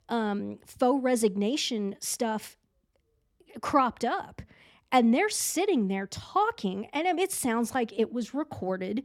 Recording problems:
none

